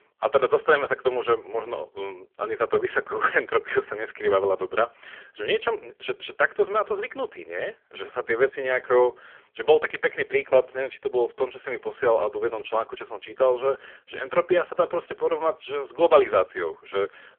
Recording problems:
phone-call audio; poor line; nothing above 3.5 kHz

